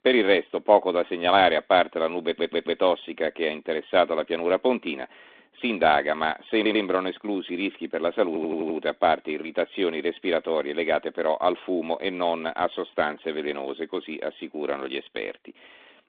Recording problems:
phone-call audio; nothing above 3.5 kHz
audio stuttering; at 2.5 s, at 6.5 s and at 8.5 s

